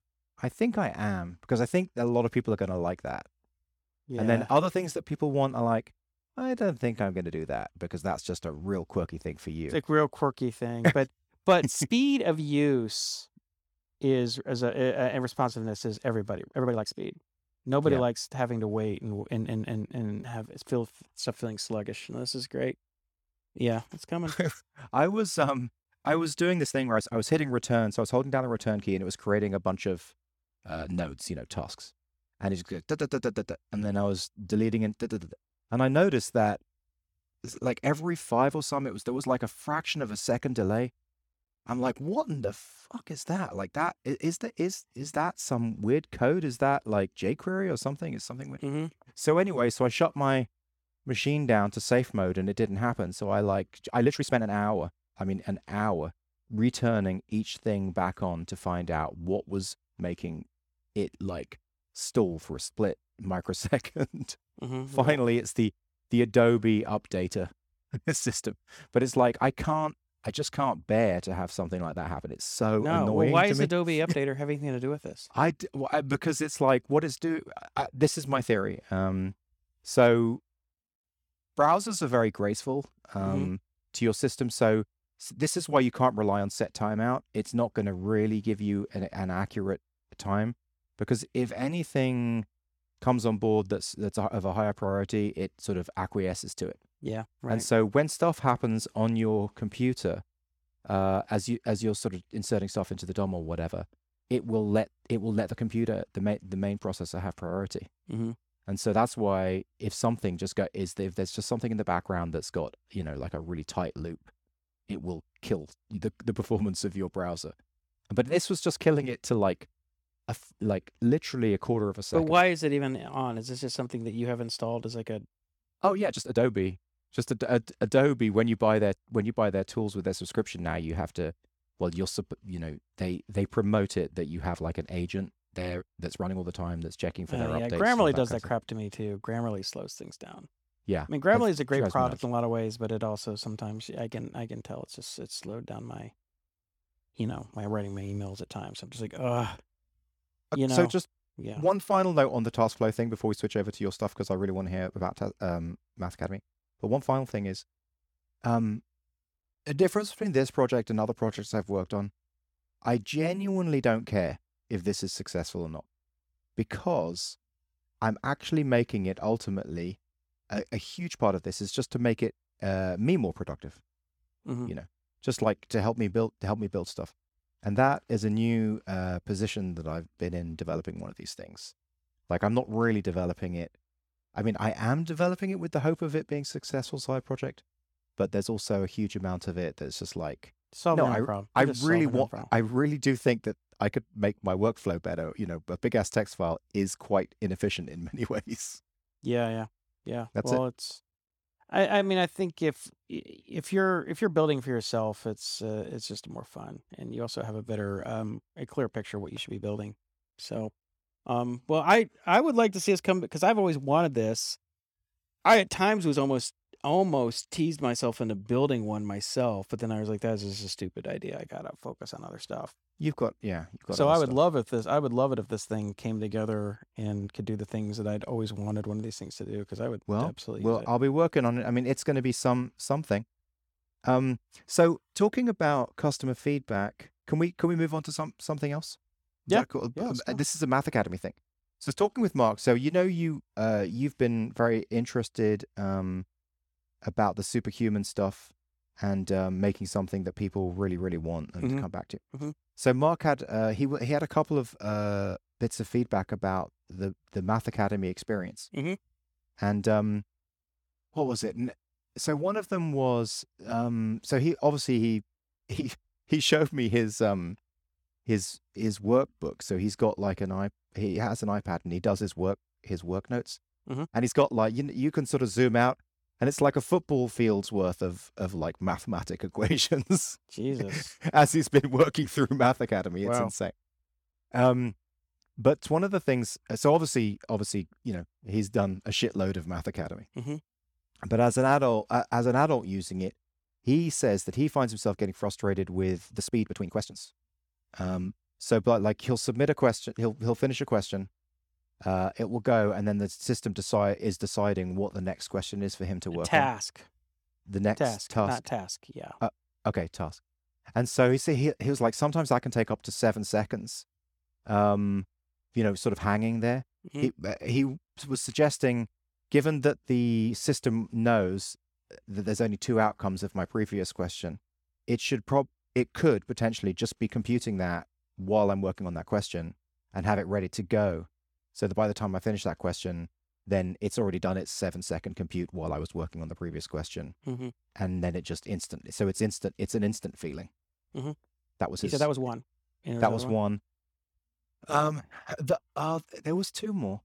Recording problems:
uneven, jittery; strongly; from 6 s to 5:43

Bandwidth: 18 kHz